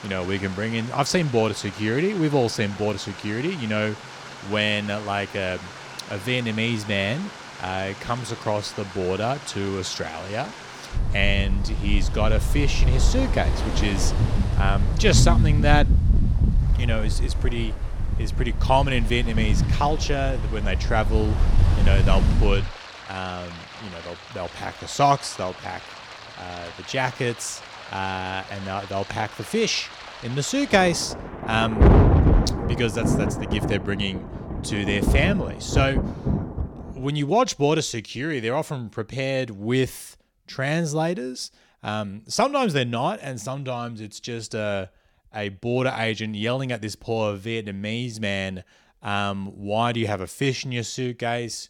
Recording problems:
rain or running water; very loud; until 37 s; 2 dB above the speech

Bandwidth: 17 kHz